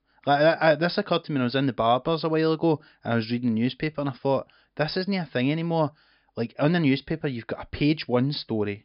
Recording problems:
high frequencies cut off; noticeable; nothing above 5 kHz

